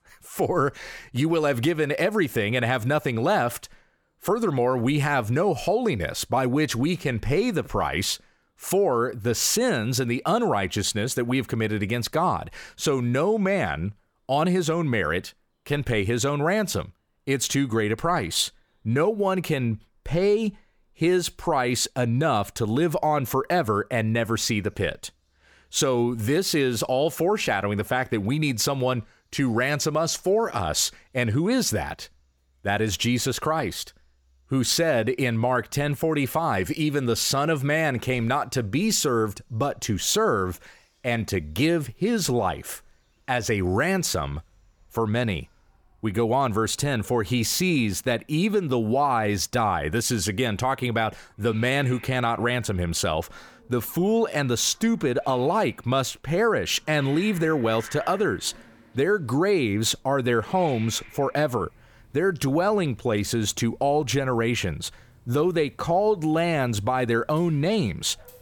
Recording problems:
animal sounds; faint; throughout; 25 dB below the speech

